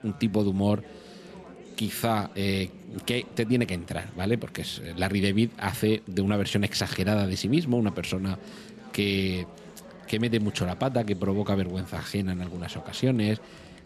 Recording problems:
chatter from many people; noticeable; throughout; 20 dB below the speech

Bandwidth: 14.5 kHz